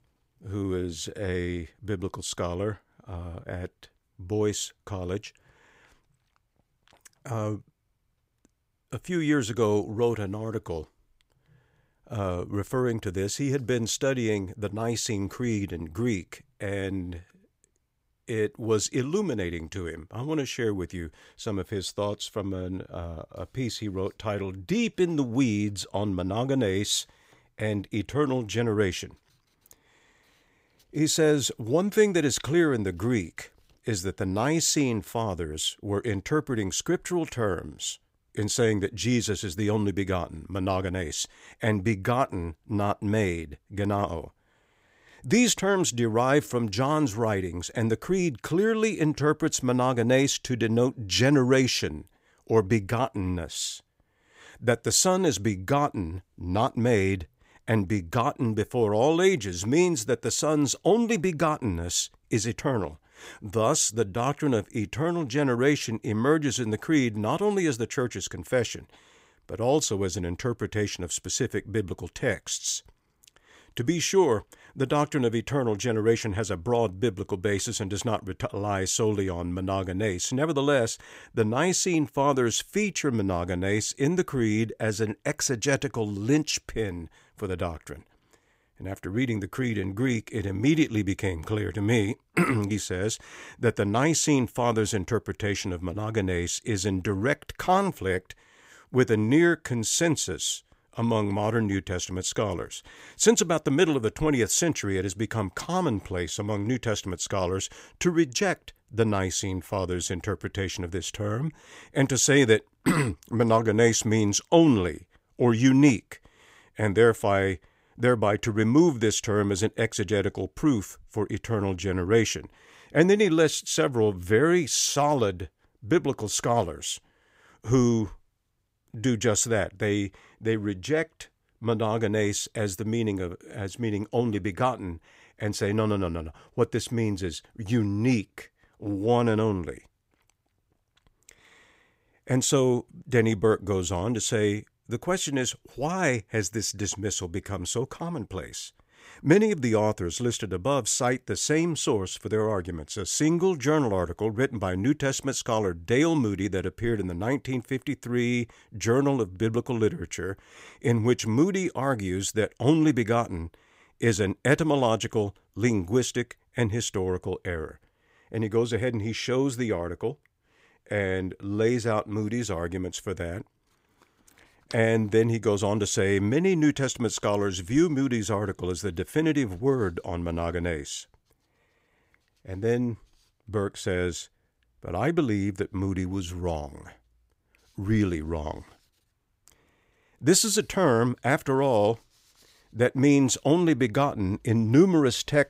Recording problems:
none

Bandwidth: 15.5 kHz